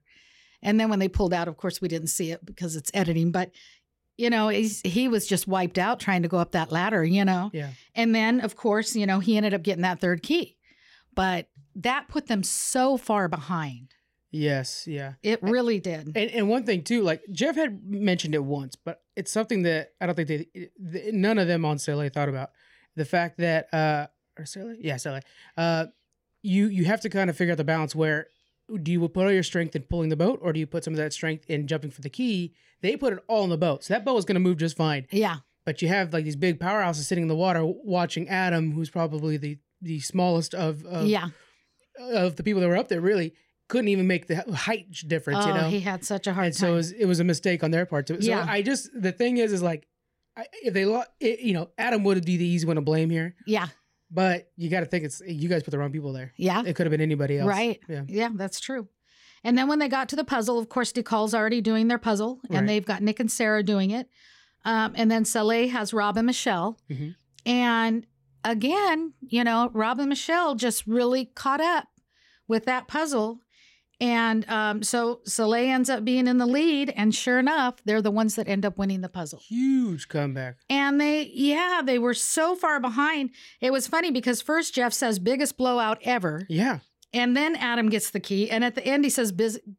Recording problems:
none

